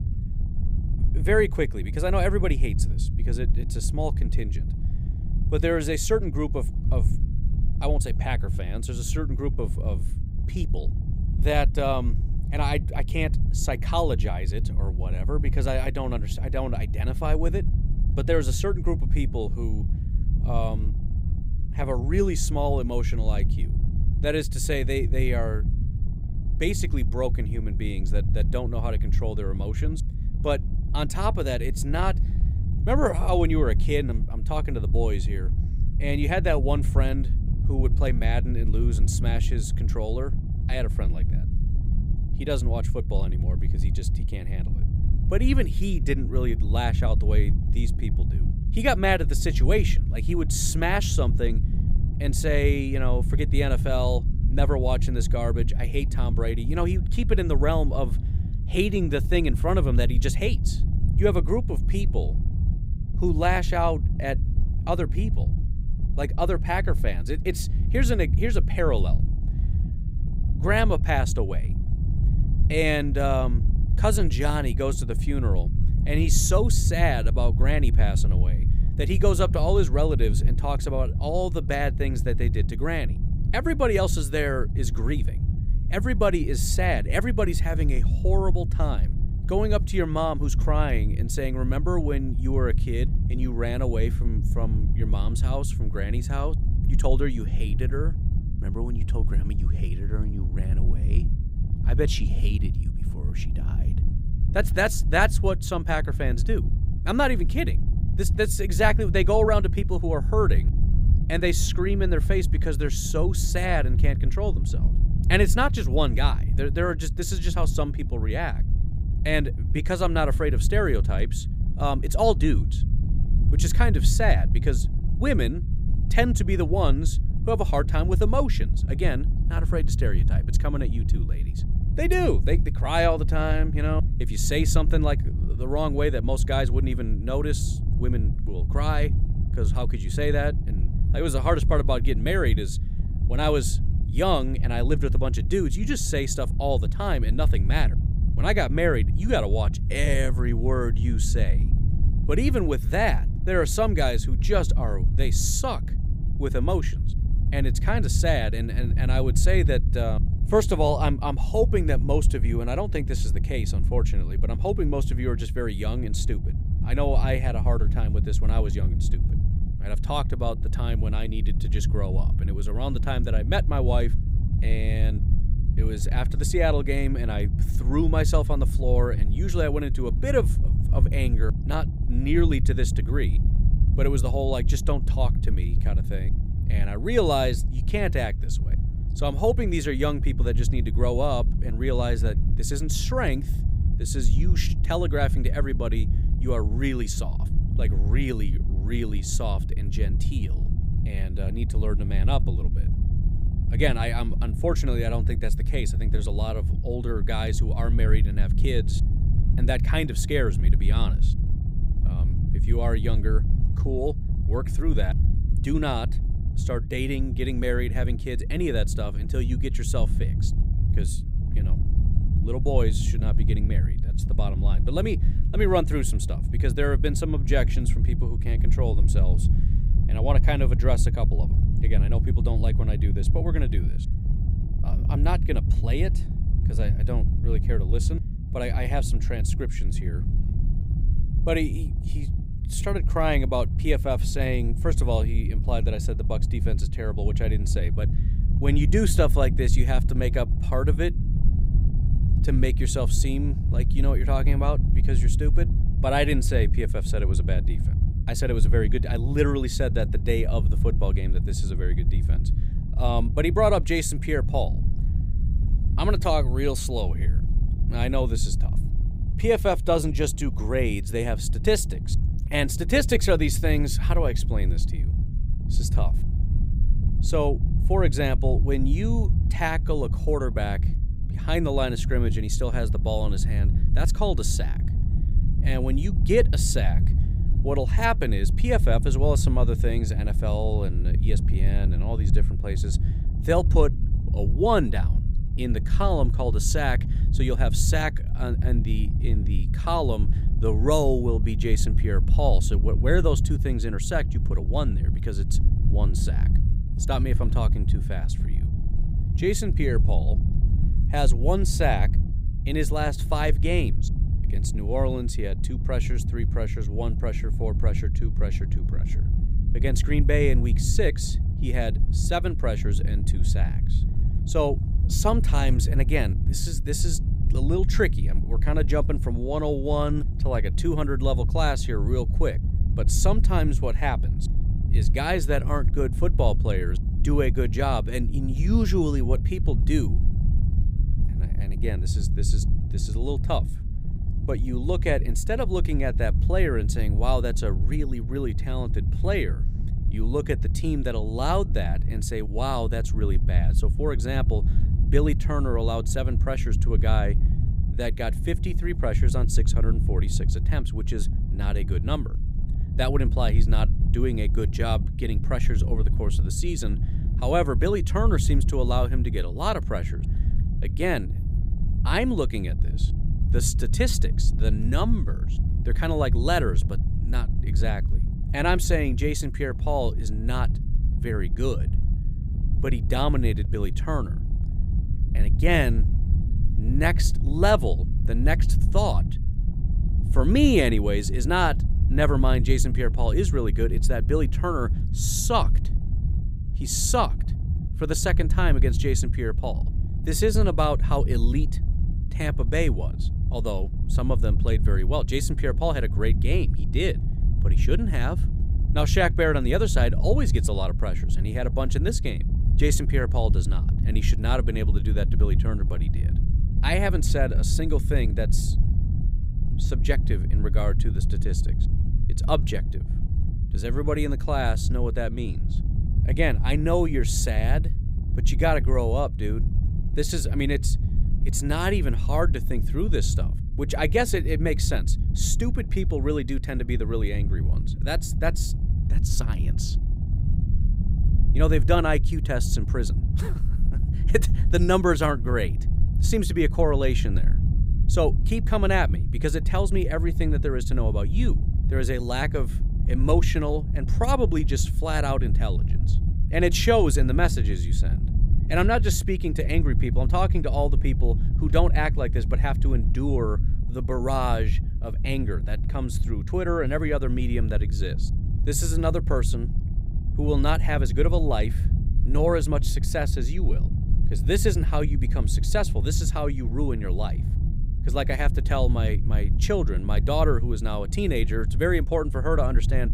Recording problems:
low rumble; noticeable; throughout; 15 dB below the speech

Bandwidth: 15.5 kHz